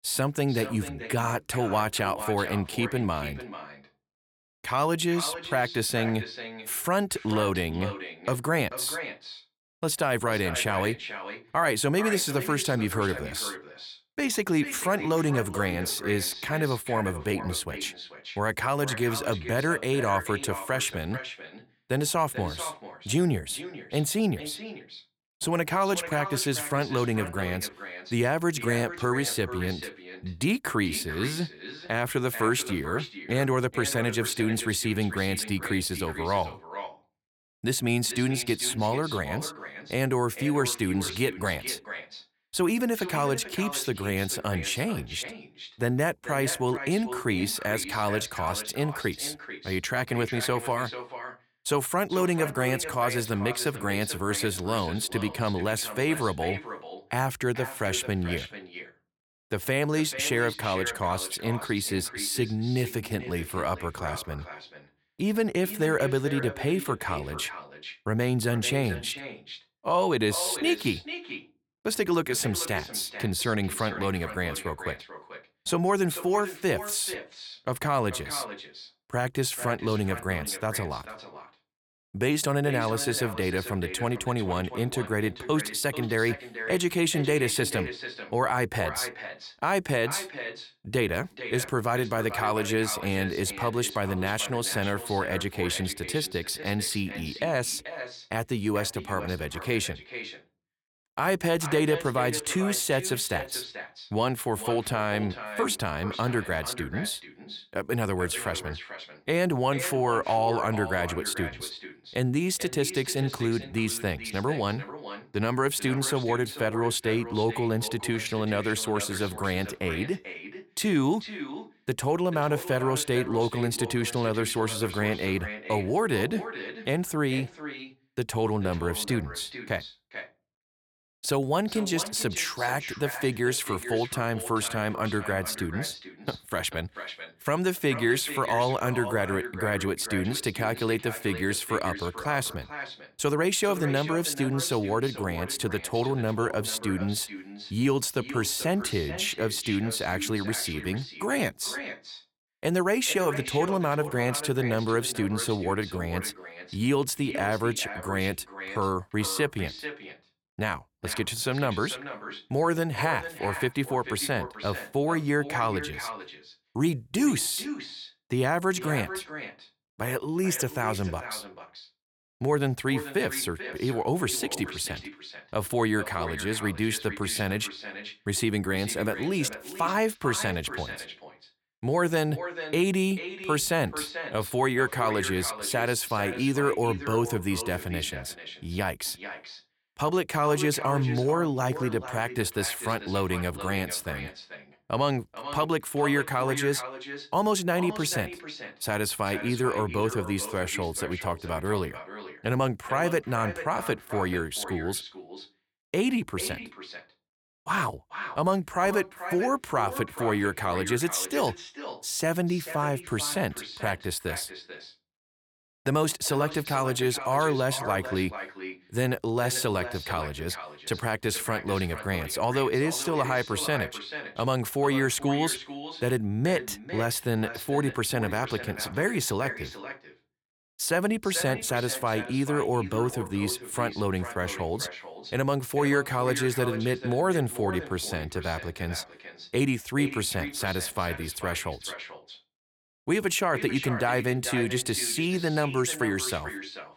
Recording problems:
echo of what is said; strong; throughout; 440 ms later, 10 dB below the speech

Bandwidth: 18.5 kHz